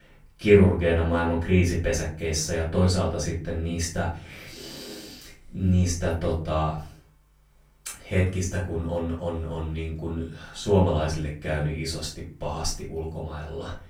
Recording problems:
off-mic speech; far
room echo; slight; dies away in 0.4 s

